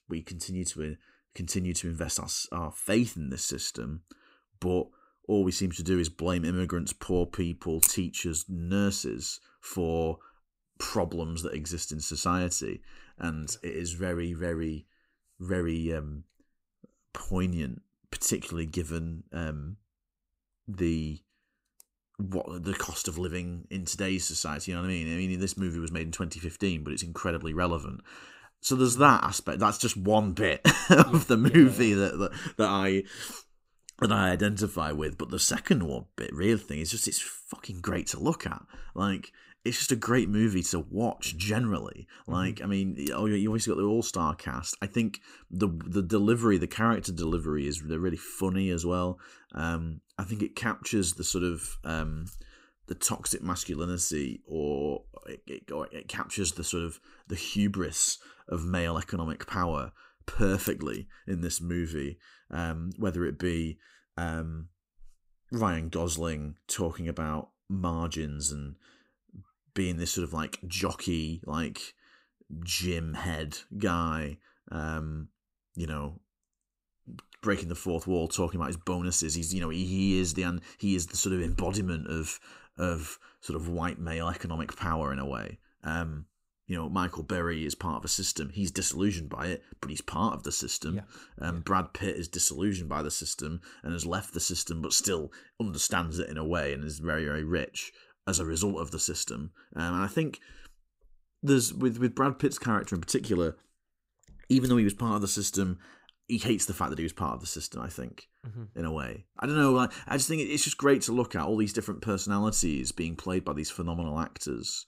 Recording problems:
none

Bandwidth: 15.5 kHz